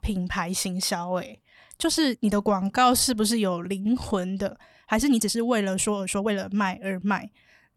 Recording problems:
uneven, jittery; strongly; from 1 to 6.5 s

